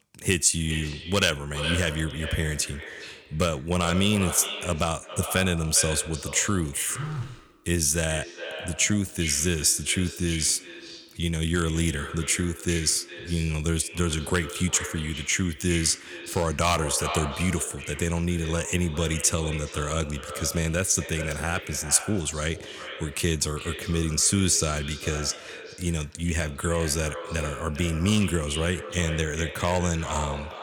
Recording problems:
echo of what is said; strong; throughout; 400 ms later, 10 dB below the speech
phone ringing; noticeable; at 7 s; peak 8 dB below the speech

